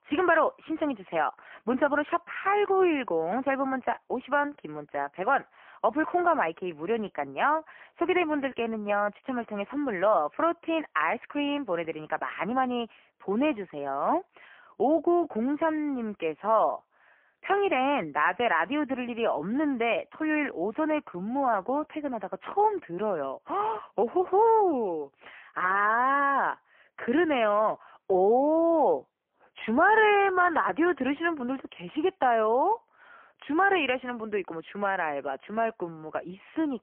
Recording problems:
phone-call audio; poor line; nothing above 3 kHz

